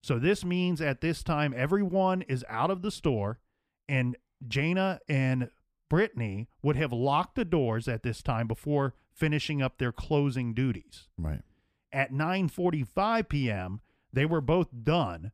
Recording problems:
none

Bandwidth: 15 kHz